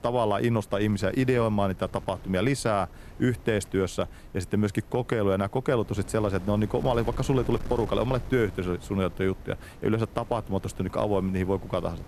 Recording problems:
wind noise on the microphone; occasional gusts; 20 dB below the speech

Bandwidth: 14.5 kHz